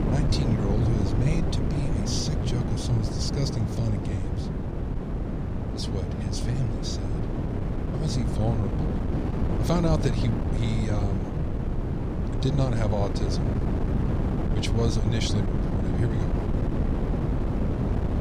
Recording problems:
wind noise on the microphone; heavy; 1 dB below the speech

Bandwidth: 14.5 kHz